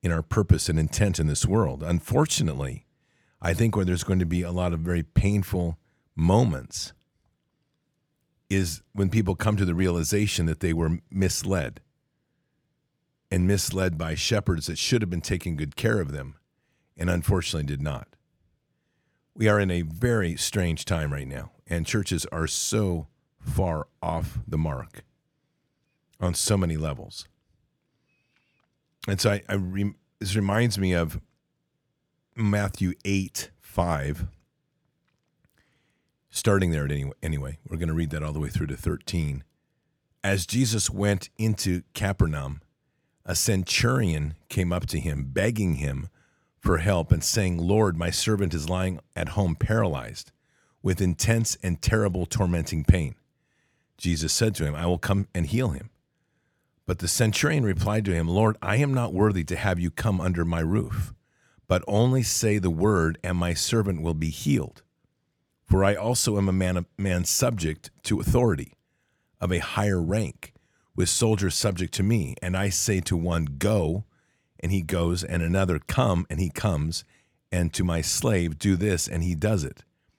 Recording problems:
none

